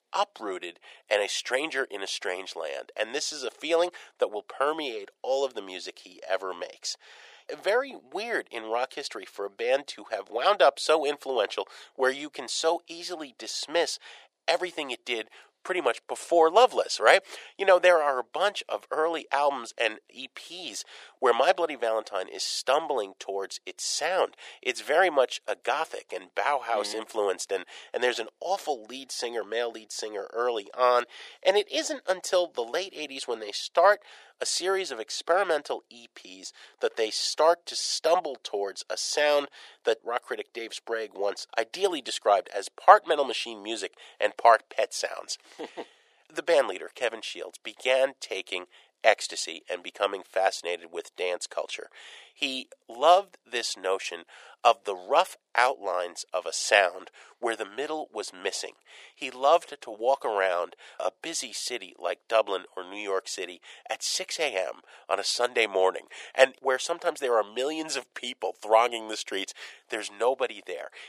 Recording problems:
thin; very; fading below 450 Hz

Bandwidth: 15 kHz